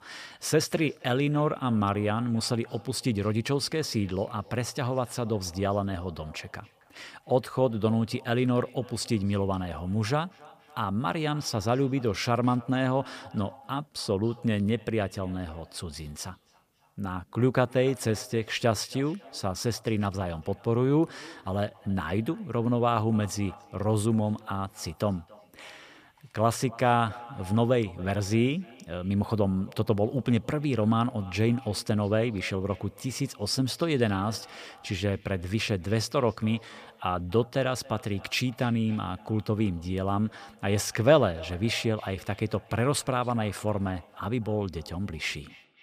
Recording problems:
echo of what is said; faint; throughout; 270 ms later, 25 dB below the speech

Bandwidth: 15 kHz